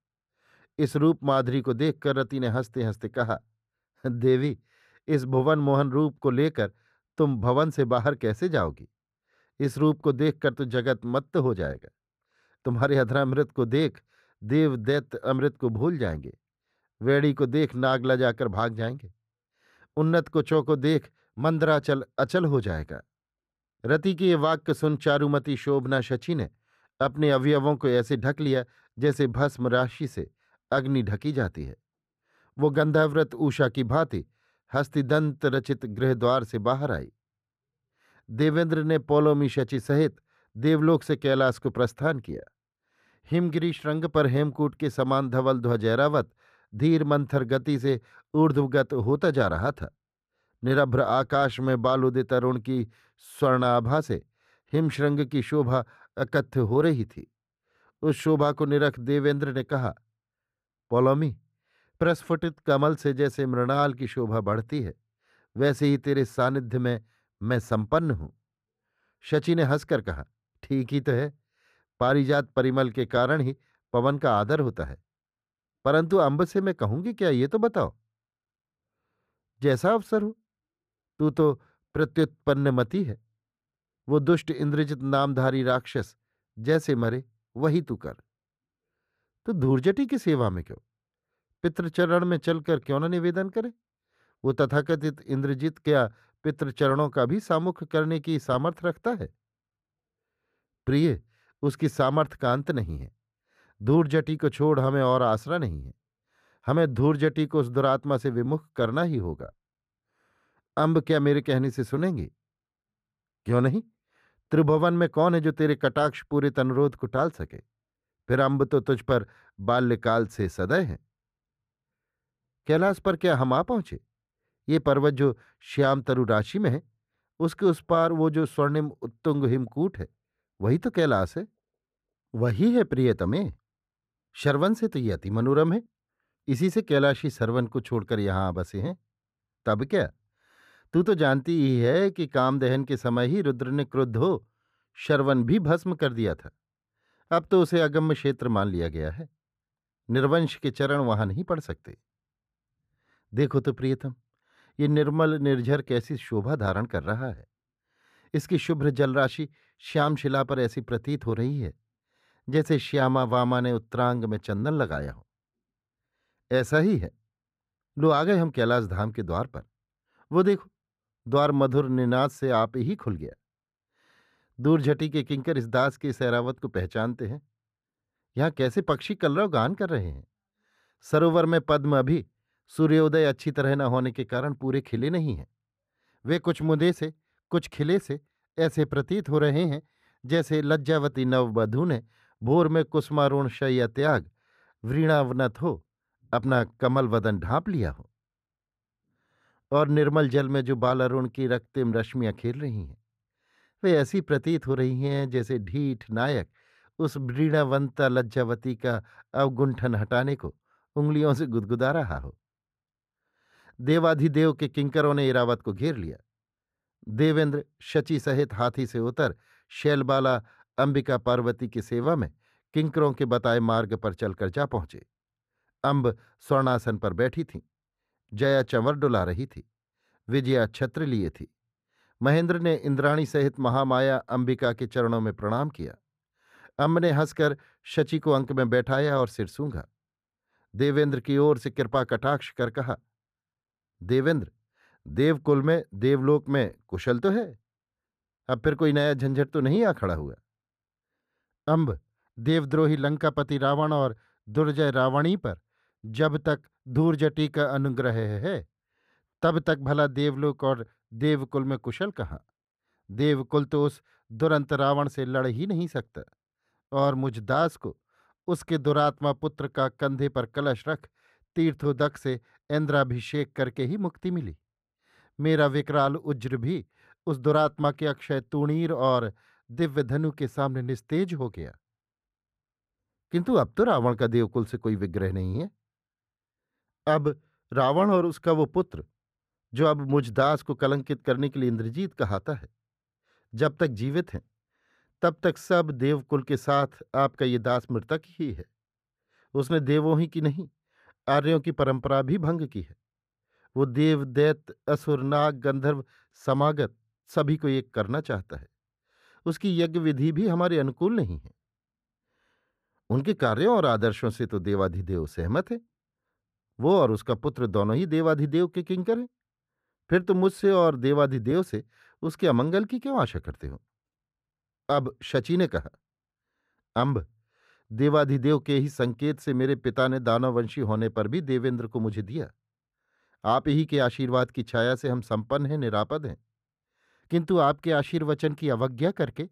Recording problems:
muffled; slightly; fading above 3 kHz

